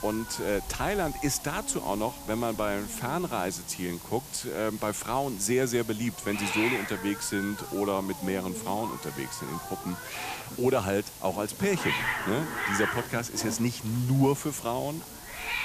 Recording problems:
hiss; loud; throughout; 6 dB below the speech

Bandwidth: 14.5 kHz